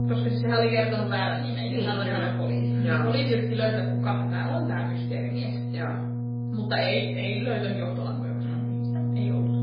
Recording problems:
off-mic speech; far
garbled, watery; badly; nothing above 4.5 kHz
room echo; slight; dies away in 0.5 s
electrical hum; loud; throughout; 60 Hz, 8 dB below the speech

